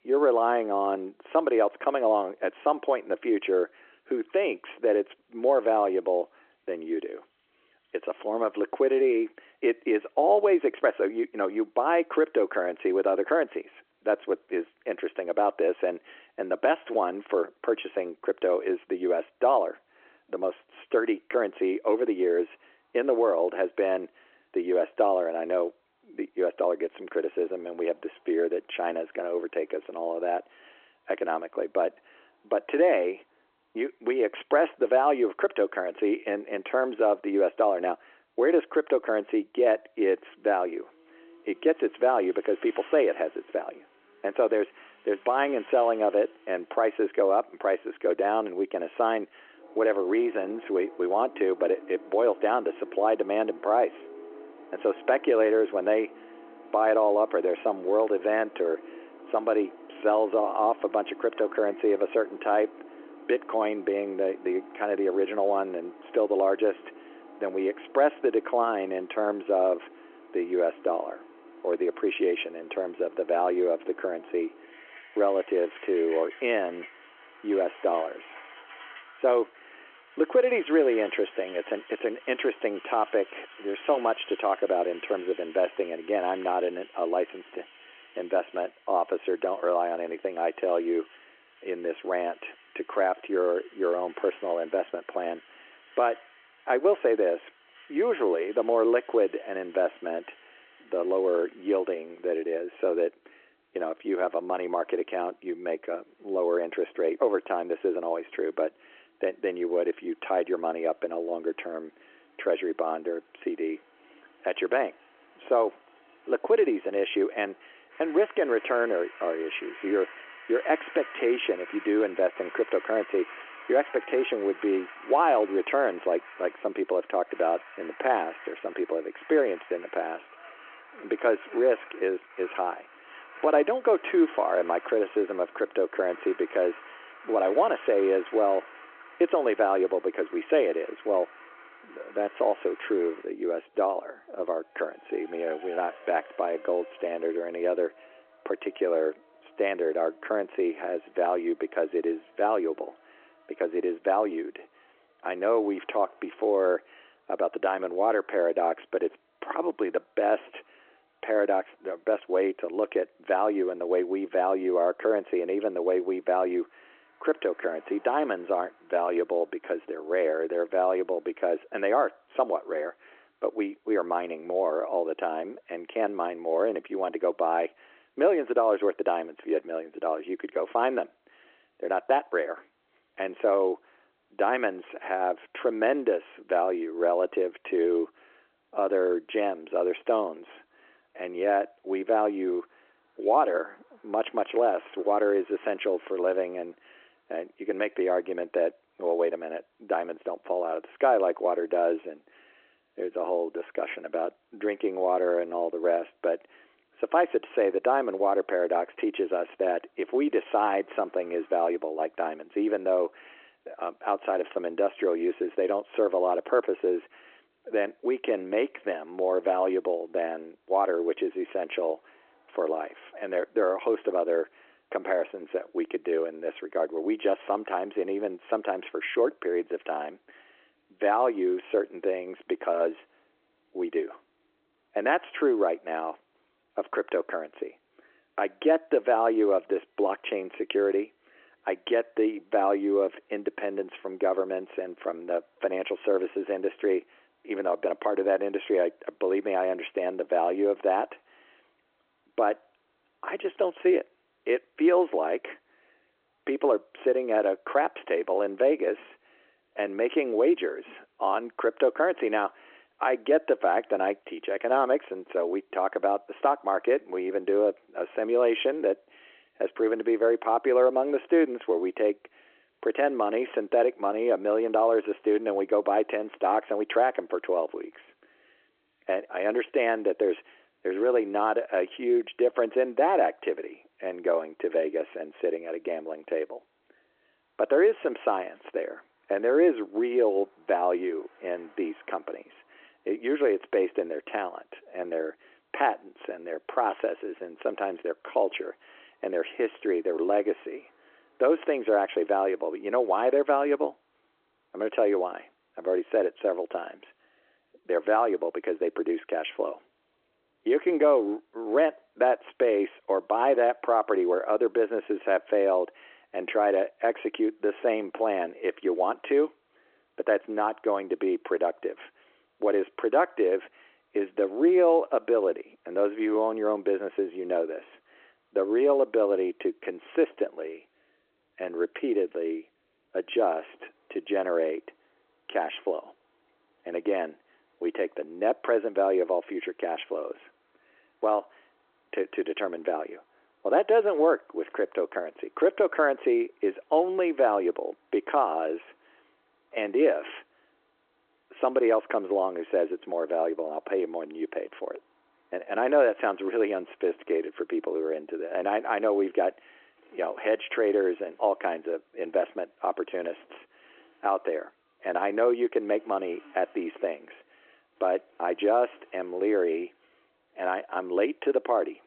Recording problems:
phone-call audio
traffic noise; faint; throughout; 20 dB below the speech

